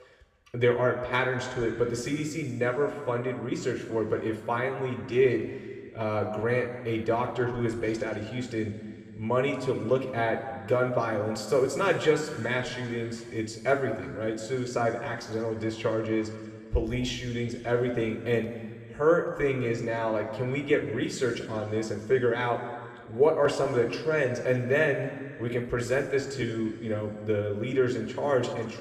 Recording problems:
room echo; noticeable; dies away in 1.9 s
off-mic speech; somewhat distant

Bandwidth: 14.5 kHz